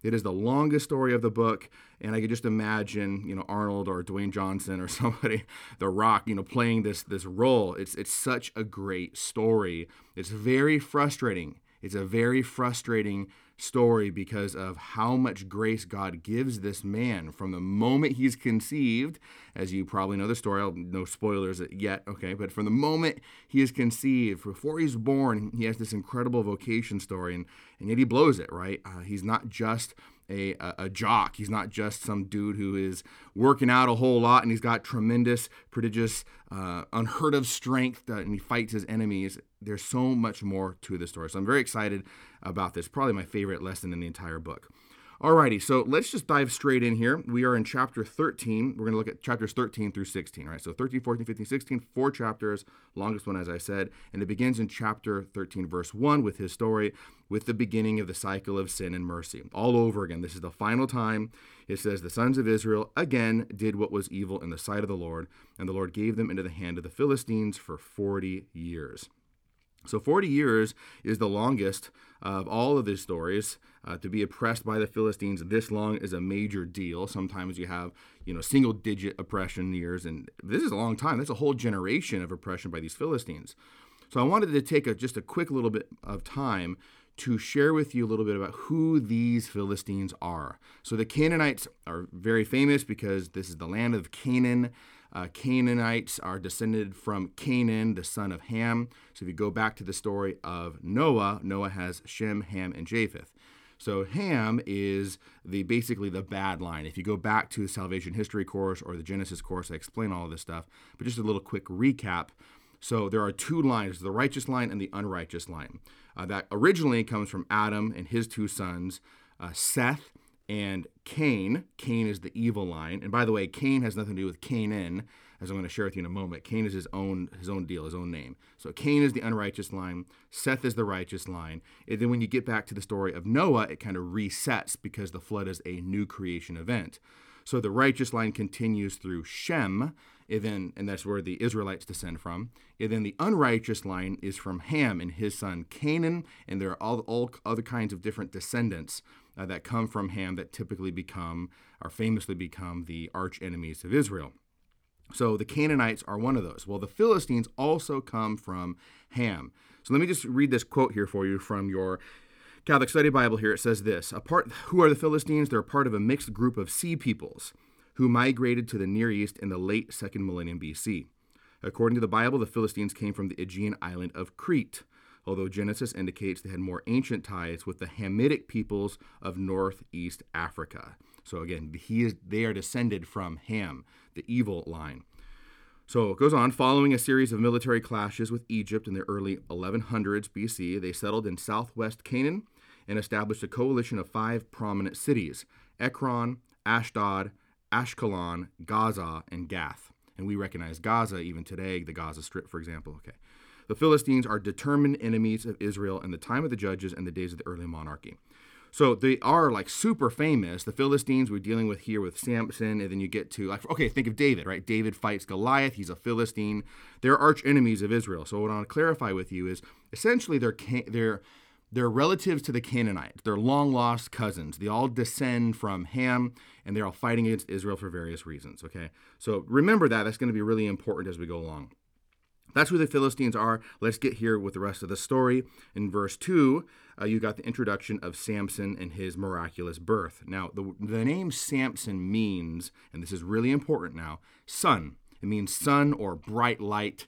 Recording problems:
none

